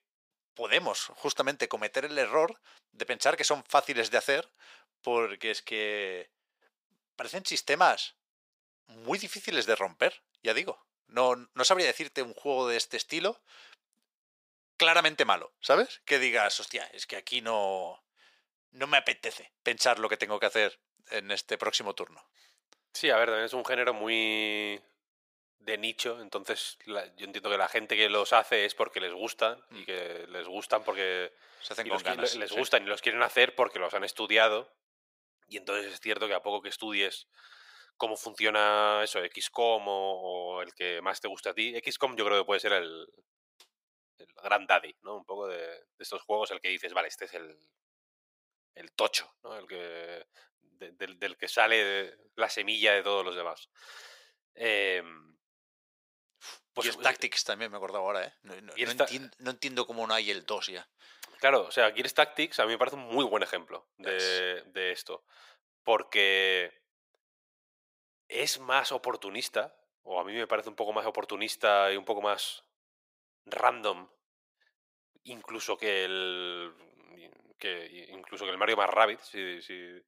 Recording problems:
thin; very; fading below 600 Hz

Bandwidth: 15.5 kHz